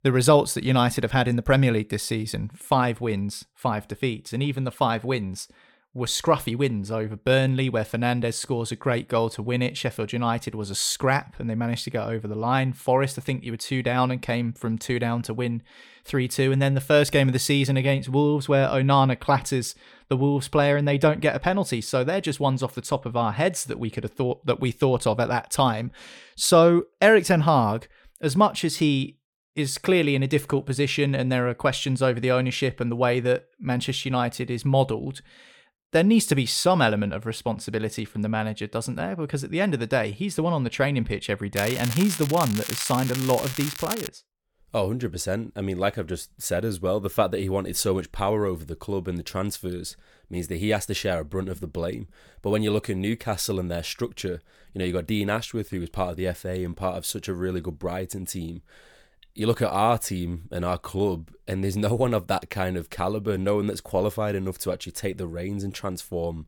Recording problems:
crackling; loud; from 42 to 44 s; 7 dB below the speech

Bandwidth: 18 kHz